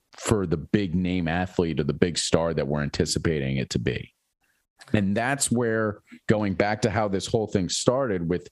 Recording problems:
squashed, flat; heavily

